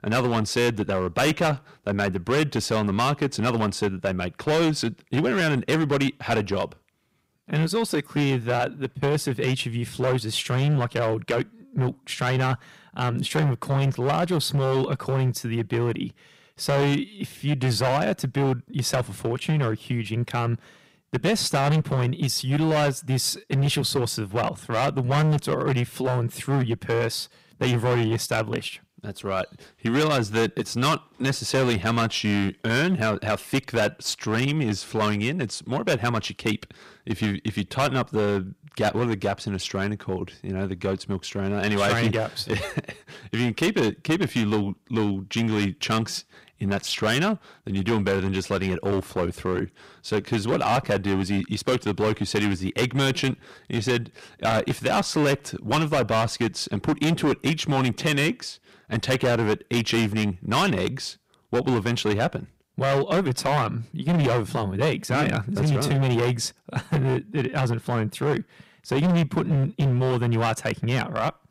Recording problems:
distortion; heavy; 13% of the sound clipped

